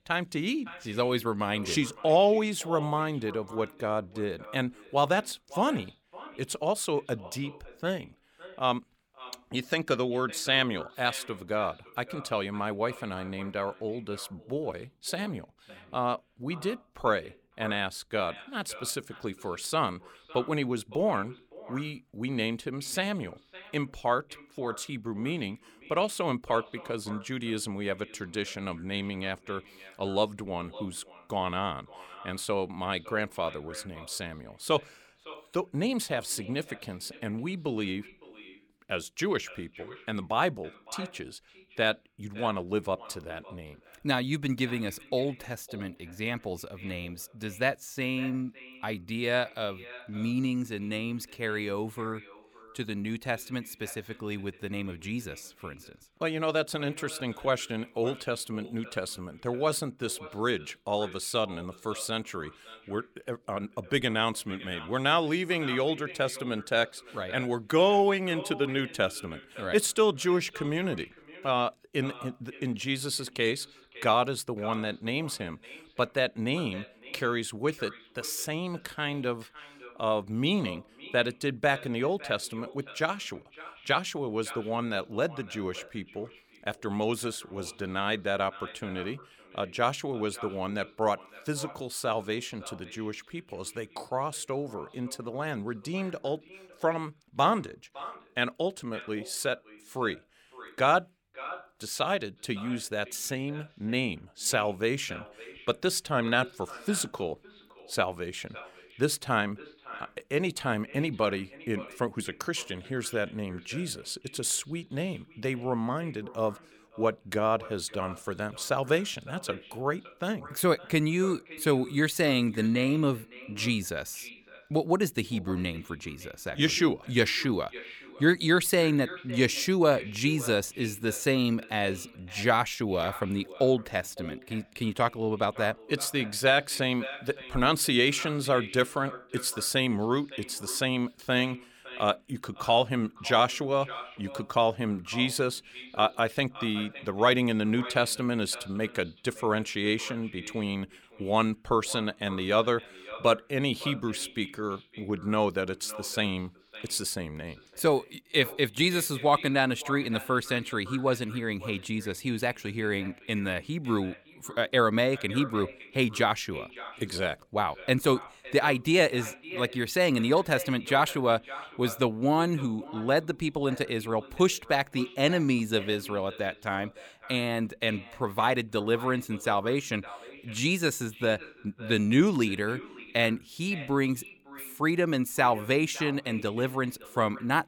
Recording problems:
echo of what is said; noticeable; throughout; 560 ms later, 15 dB below the speech

